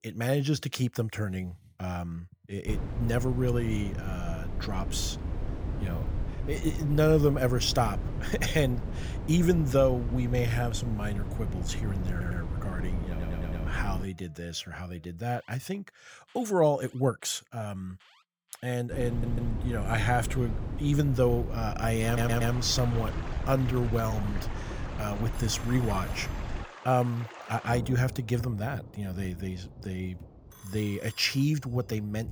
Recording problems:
rain or running water; noticeable; from 22 s on; 15 dB below the speech
wind noise on the microphone; occasional gusts; from 2.5 to 14 s and from 19 to 27 s; 15 dB below the speech
alarms or sirens; faint; throughout; 30 dB below the speech
uneven, jittery; strongly; from 6.5 to 24 s
audio stuttering; 4 times, first at 12 s

